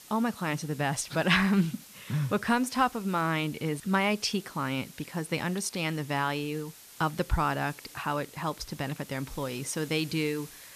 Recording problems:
hiss; noticeable; throughout; 20 dB below the speech

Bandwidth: 14.5 kHz